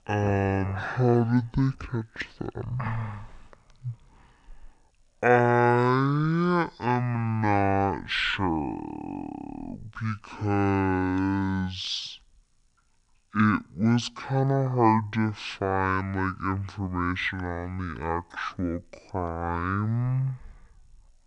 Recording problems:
wrong speed and pitch; too slow and too low; 0.5 times normal speed

